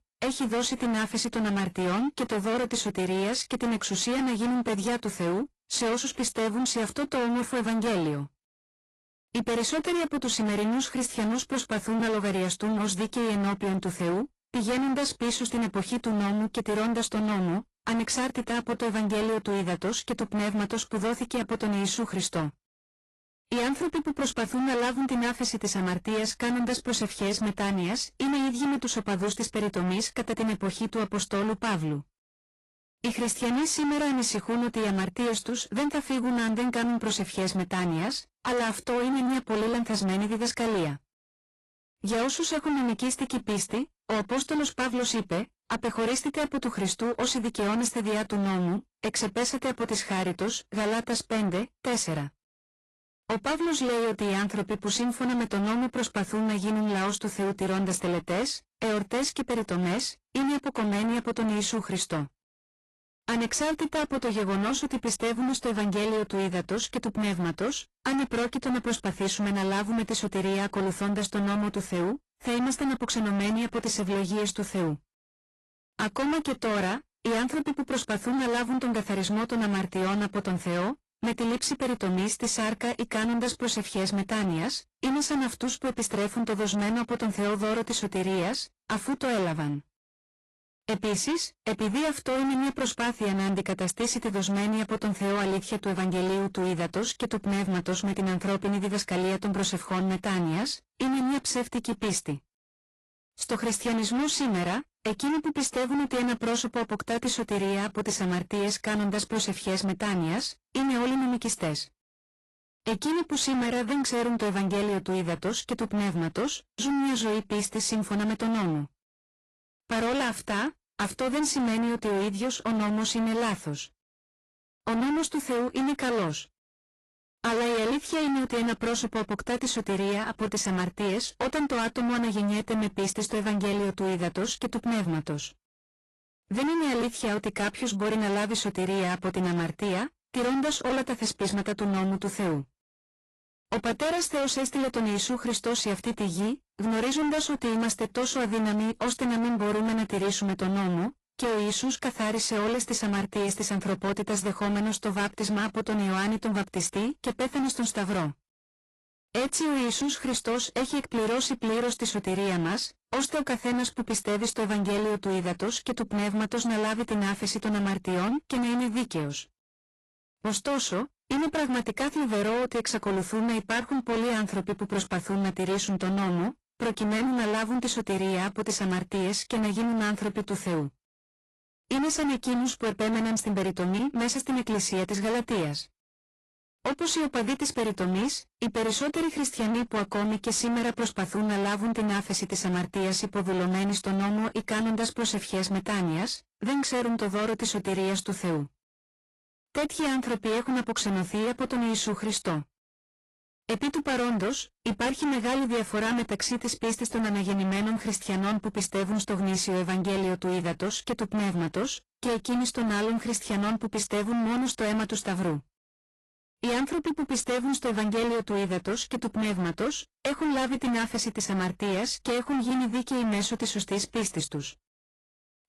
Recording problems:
distortion; heavy; 30% of the sound clipped
garbled, watery; slightly; nothing above 11.5 kHz

